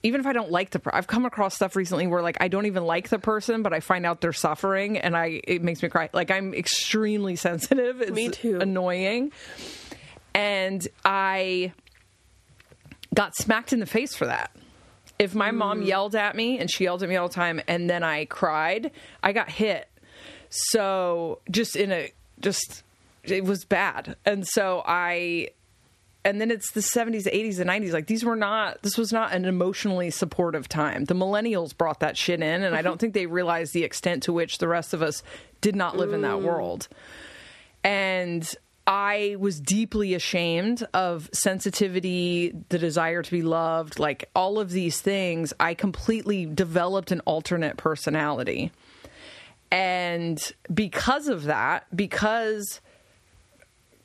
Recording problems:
squashed, flat; somewhat

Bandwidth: 13.5 kHz